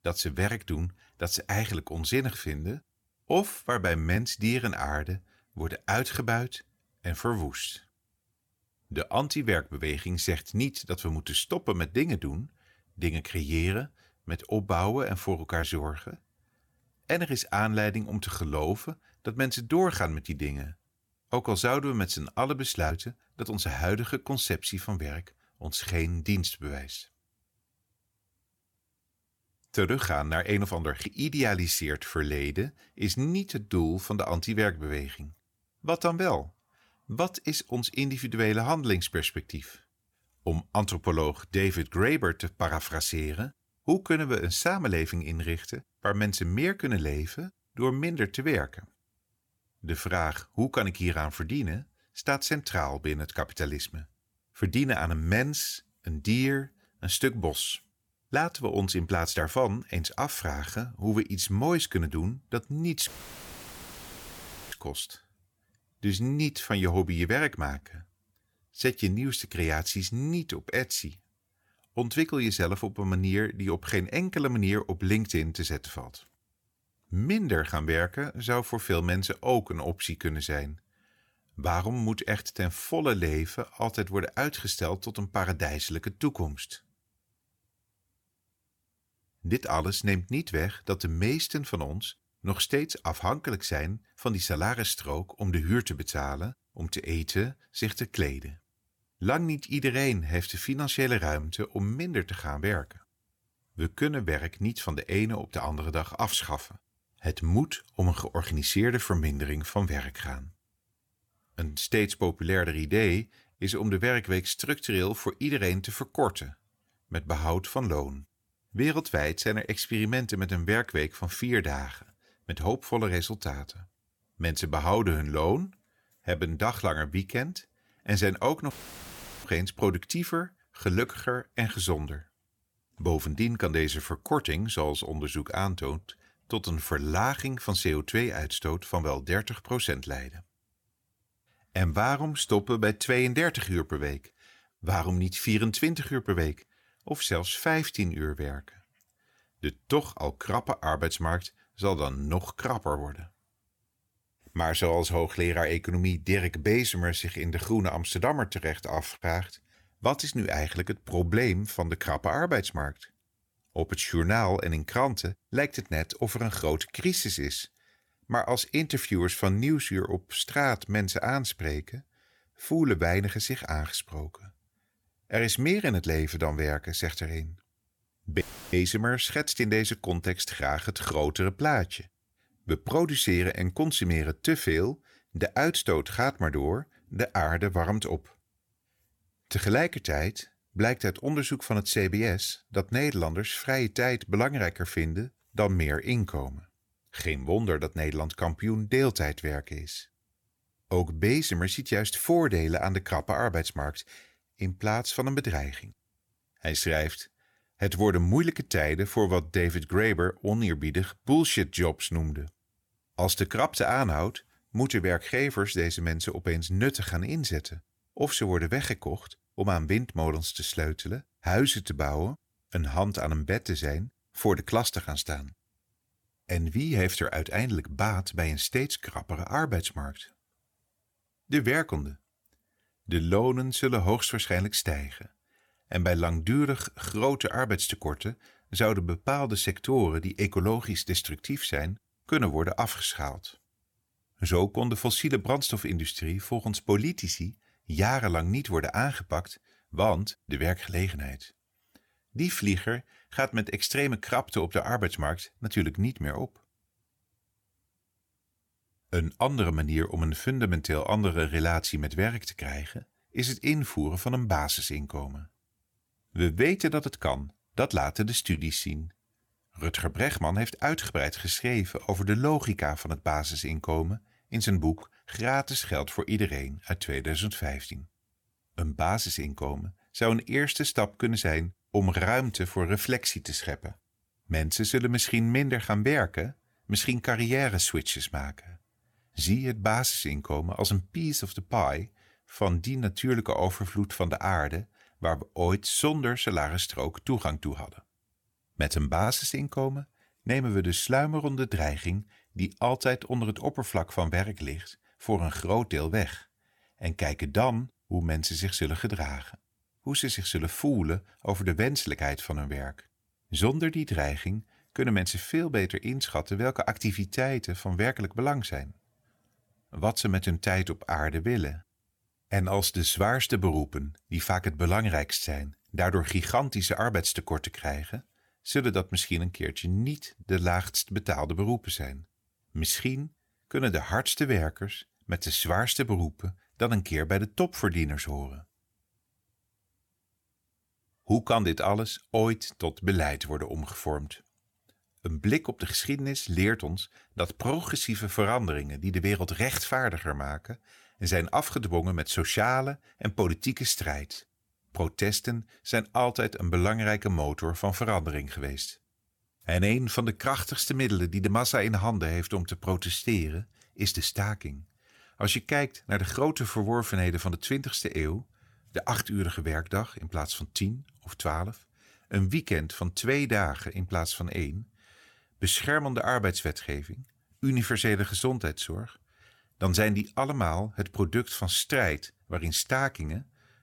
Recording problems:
audio cutting out; filled with static; at 1:03 for 1.5 s, at 2:09 for 0.5 s and at 2:58

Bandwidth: 18.5 kHz